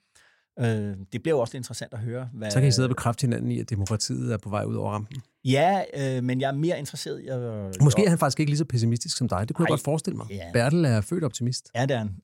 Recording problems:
none

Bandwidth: 16 kHz